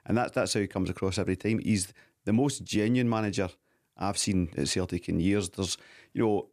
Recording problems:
none

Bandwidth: 14.5 kHz